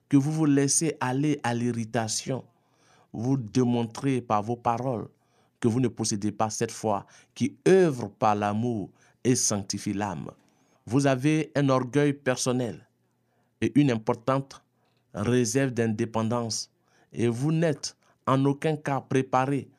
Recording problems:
uneven, jittery; strongly; from 2 to 17 s

